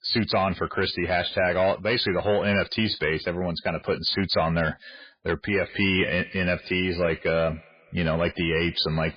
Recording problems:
garbled, watery; badly; nothing above 4.5 kHz
echo of what is said; faint; from 5.5 s on; 120 ms later, 20 dB below the speech
distortion; slight; 10 dB below the speech

